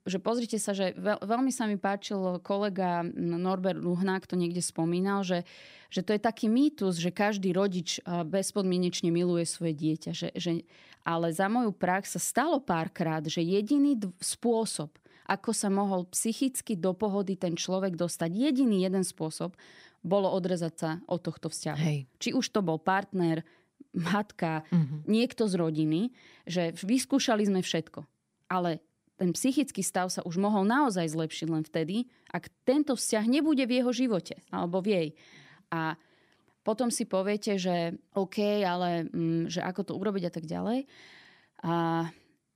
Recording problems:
none

